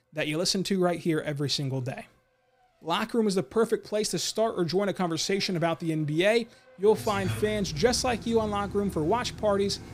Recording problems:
traffic noise; noticeable; throughout; 15 dB below the speech

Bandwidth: 15.5 kHz